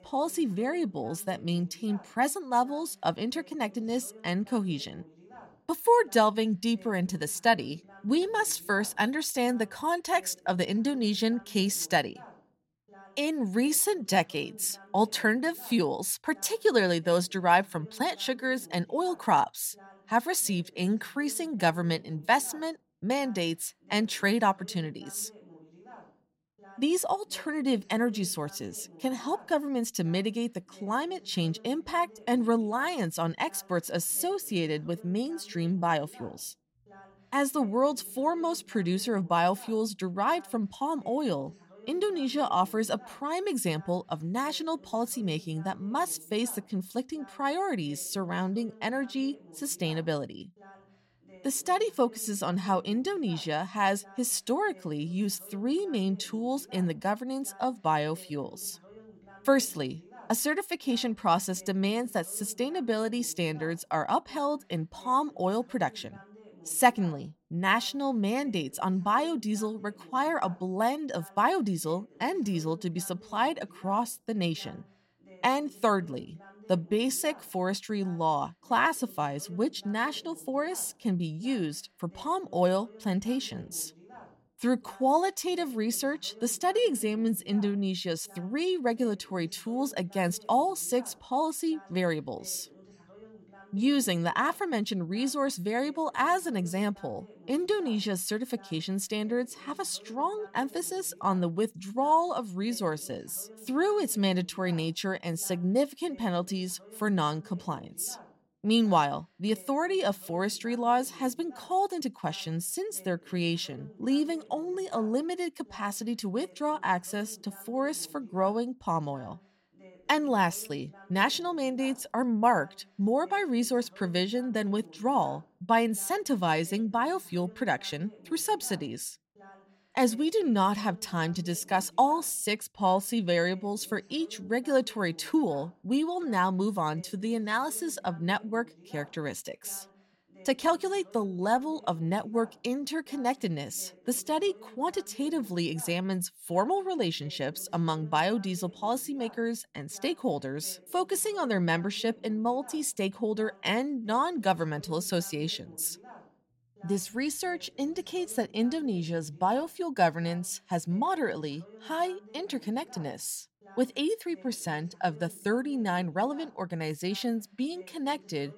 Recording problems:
voice in the background; faint; throughout; 25 dB below the speech

